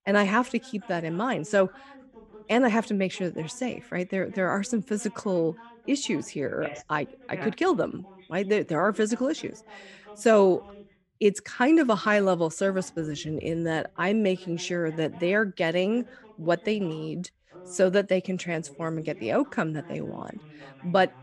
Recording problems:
voice in the background; faint; throughout; 25 dB below the speech

